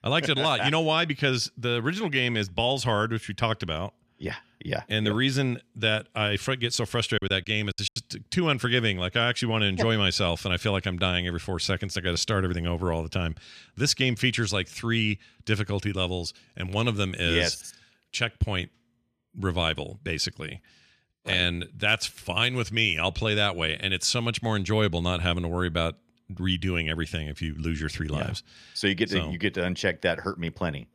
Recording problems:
choppy; very; at 7 s; 10% of the speech affected

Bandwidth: 14.5 kHz